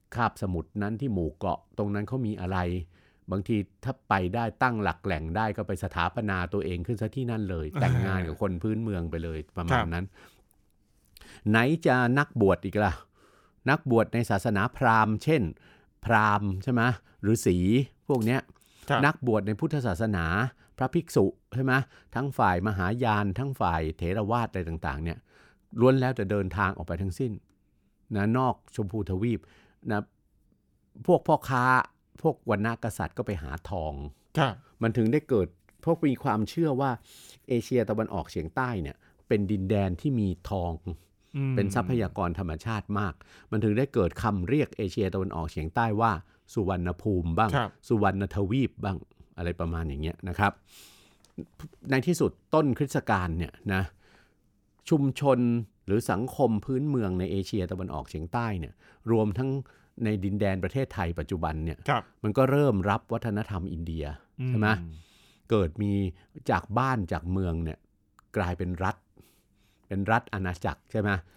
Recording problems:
none

